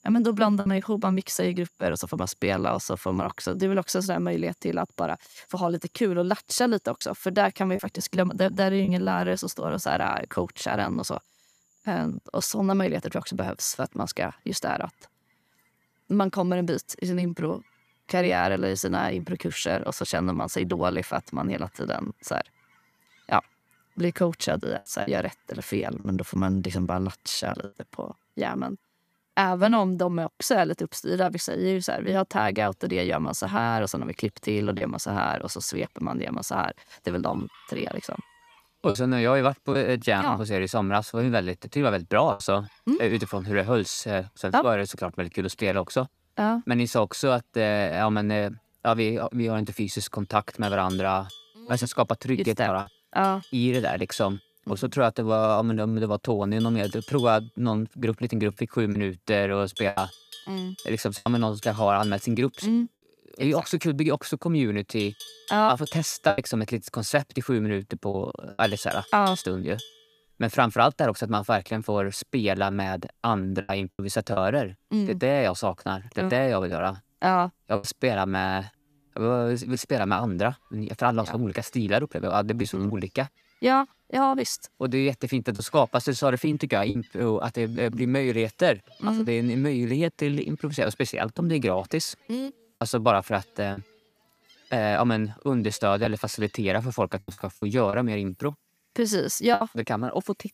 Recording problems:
animal sounds; noticeable; throughout; 20 dB below the speech
choppy; occasionally; 2% of the speech affected

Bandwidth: 14.5 kHz